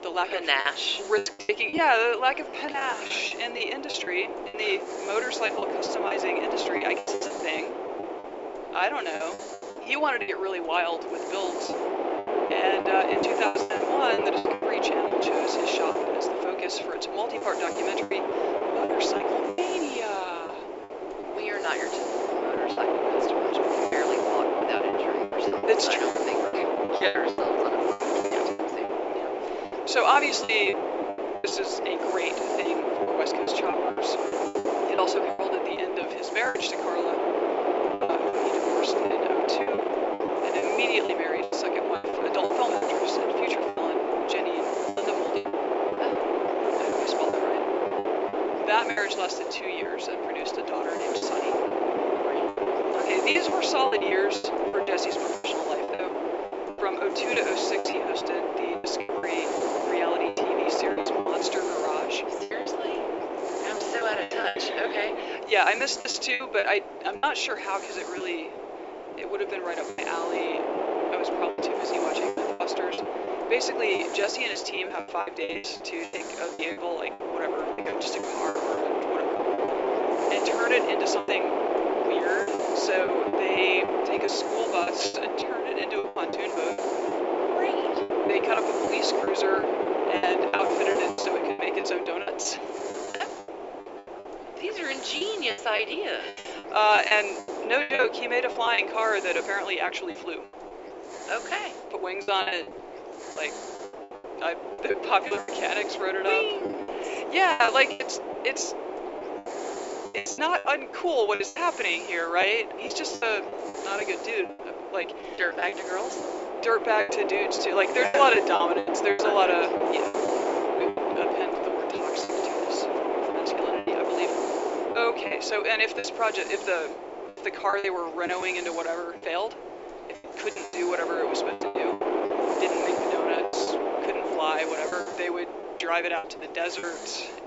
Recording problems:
thin; very; fading below 350 Hz
high frequencies cut off; noticeable; nothing above 8 kHz
wind noise on the microphone; heavy; 1 dB below the speech
hiss; noticeable; throughout; 15 dB below the speech
choppy; very; 12% of the speech affected

